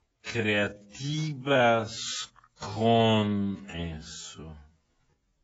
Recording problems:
garbled, watery; badly; nothing above 7.5 kHz
wrong speed, natural pitch; too slow; 0.5 times normal speed

